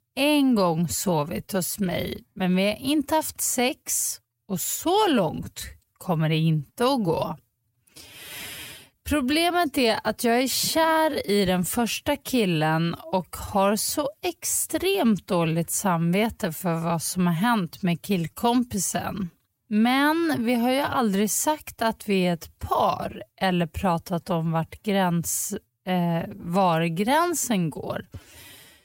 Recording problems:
wrong speed, natural pitch; too slow; 0.7 times normal speed

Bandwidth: 16 kHz